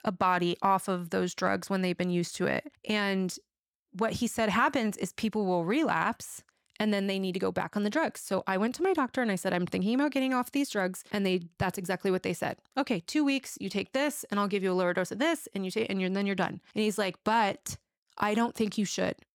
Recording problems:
none

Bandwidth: 18 kHz